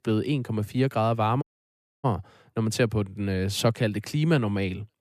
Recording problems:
audio cutting out; at 1.5 s for 0.5 s

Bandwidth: 14.5 kHz